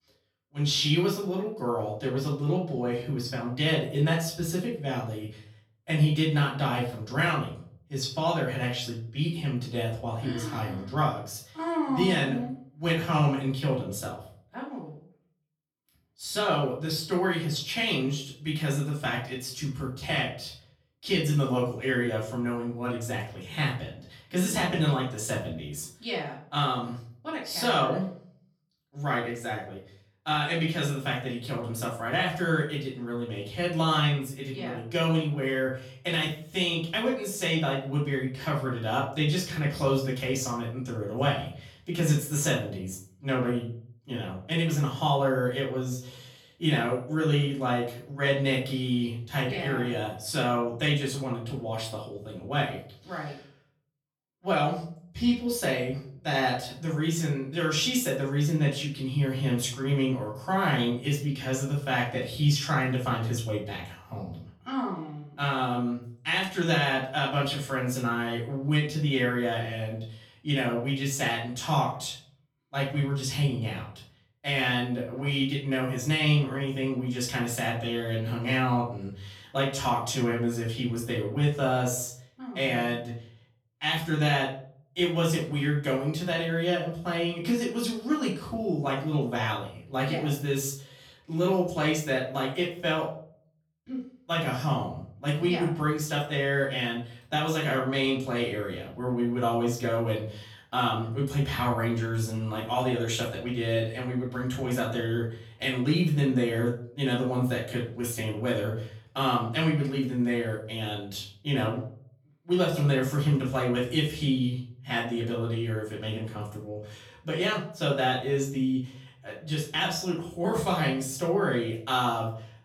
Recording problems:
off-mic speech; far
room echo; slight; dies away in 0.5 s

